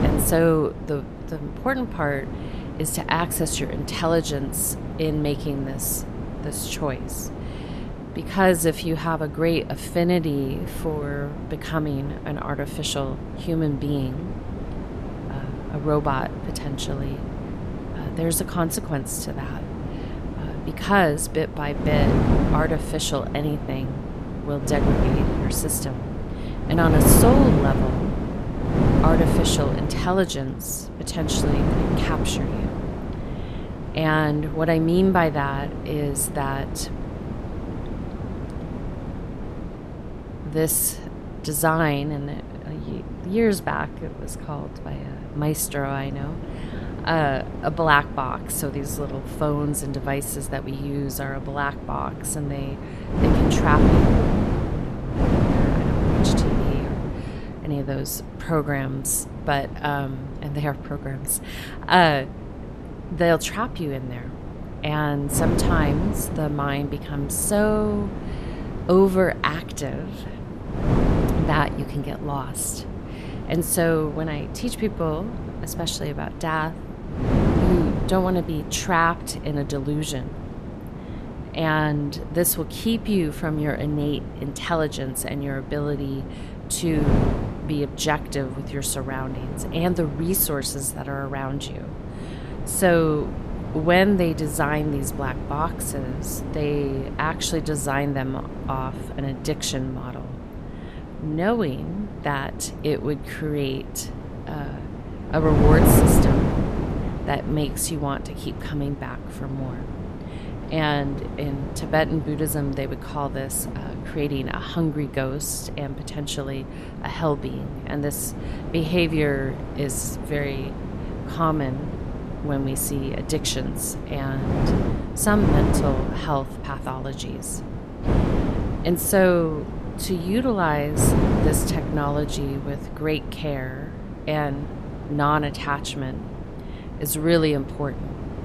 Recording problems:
wind noise on the microphone; heavy; 7 dB below the speech

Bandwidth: 14 kHz